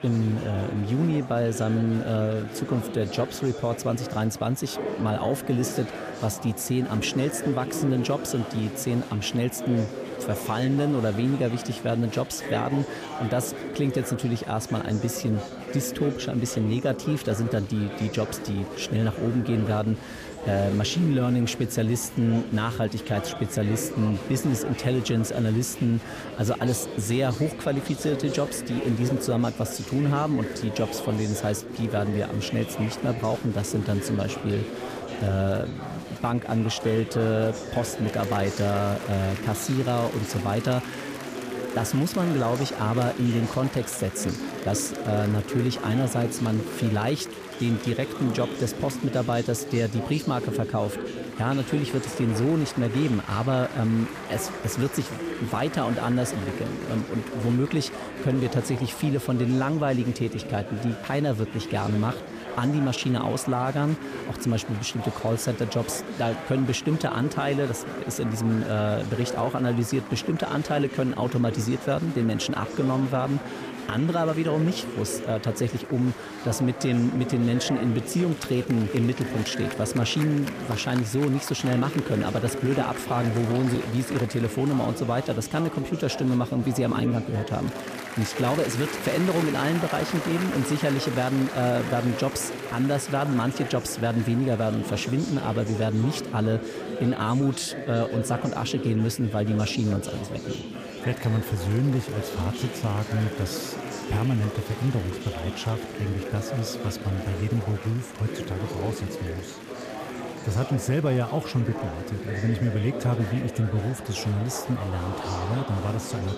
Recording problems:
chatter from many people; loud; throughout; 8 dB below the speech

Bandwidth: 14.5 kHz